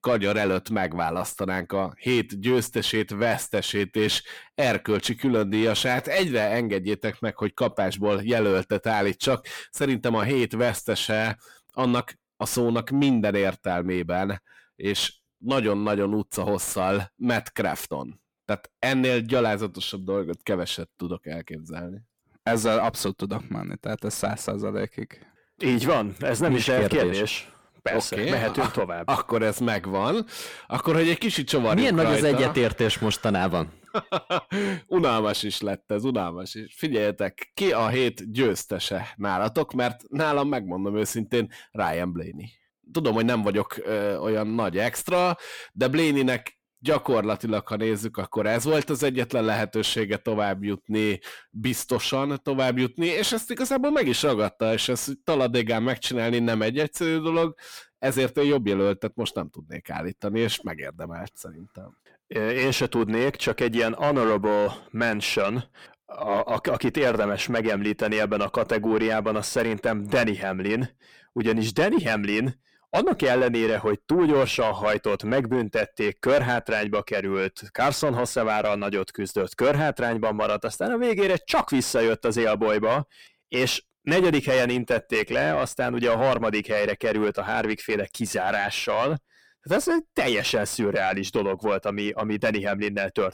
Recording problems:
distortion; slight; 10 dB below the speech

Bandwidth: 19 kHz